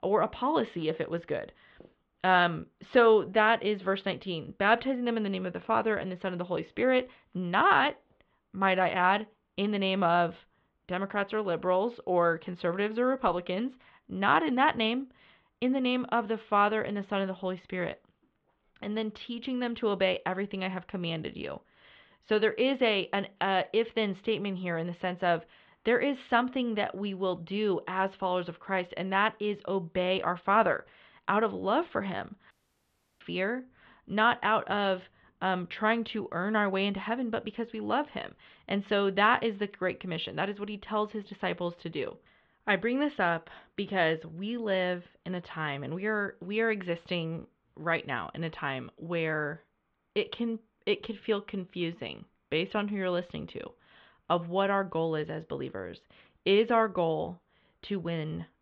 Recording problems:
muffled; very; fading above 3.5 kHz
audio cutting out; at 33 s for 0.5 s

